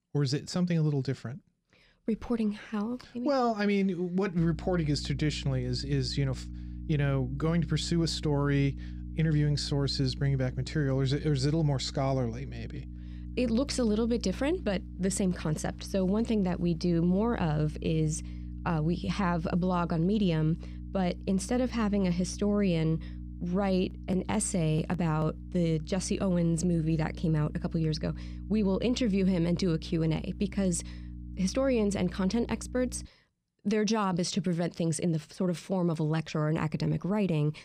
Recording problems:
electrical hum; faint; from 4.5 to 33 s; 60 Hz, 20 dB below the speech

